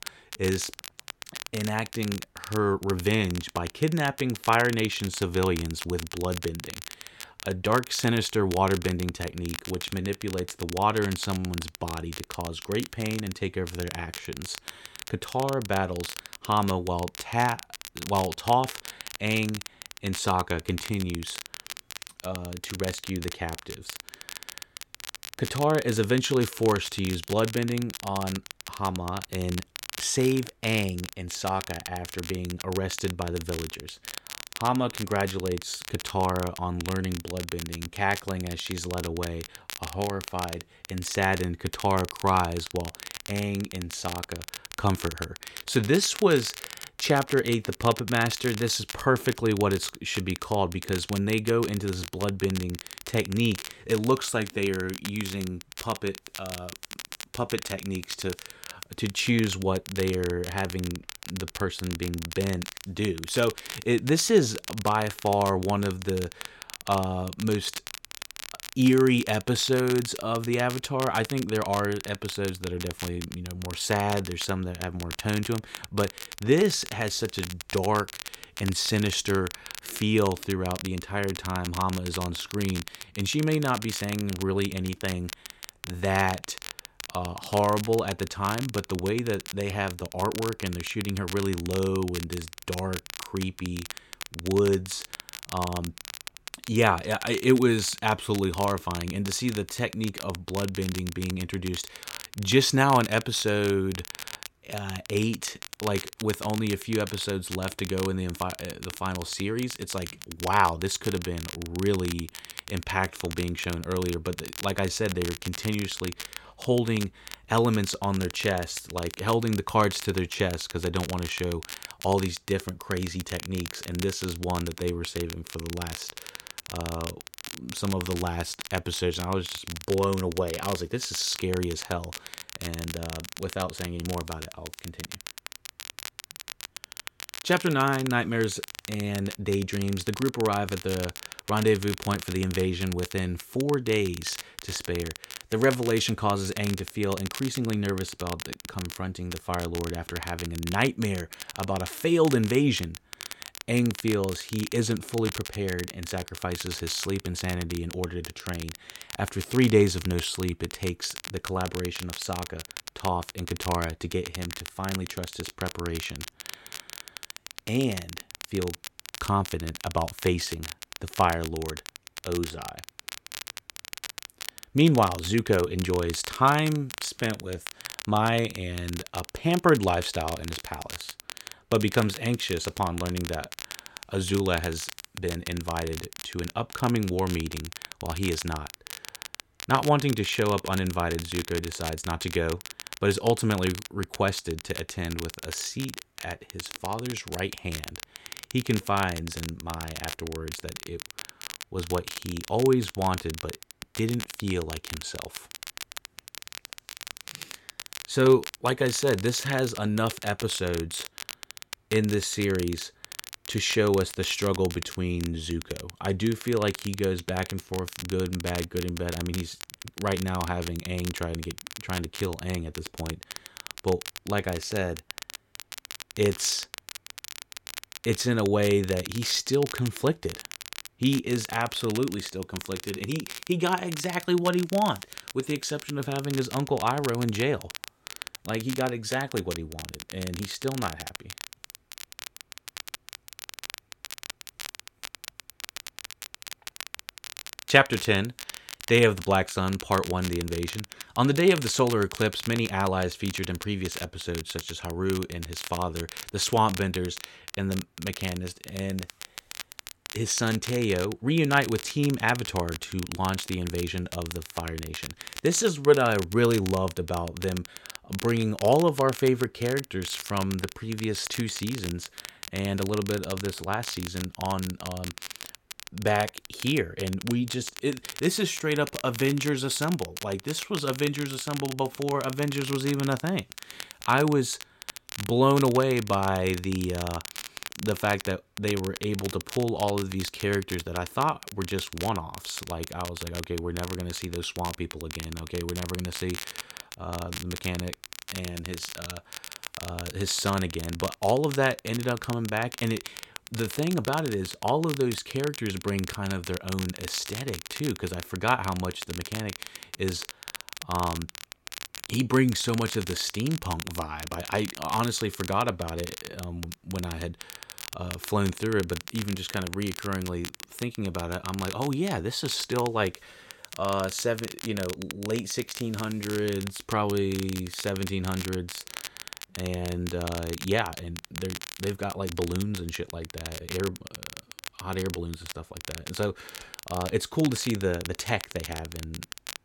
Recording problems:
crackle, like an old record; noticeable; 10 dB below the speech

